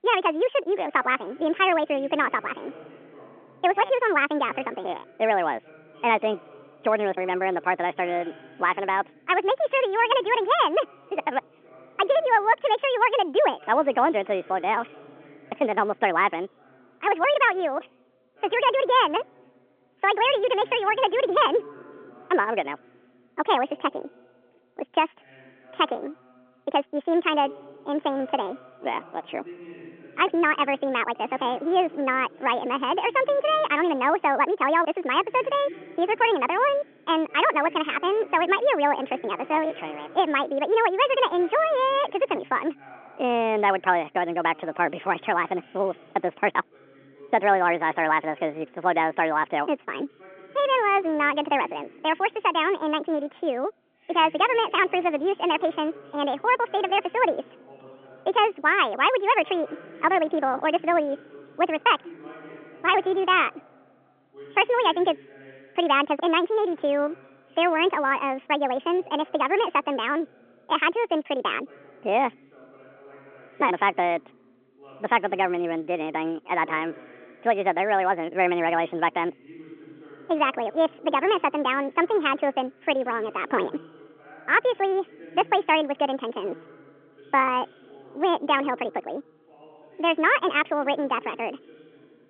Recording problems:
wrong speed and pitch; too fast and too high; 1.5 times normal speed
phone-call audio; nothing above 3.5 kHz
voice in the background; faint; throughout; 25 dB below the speech

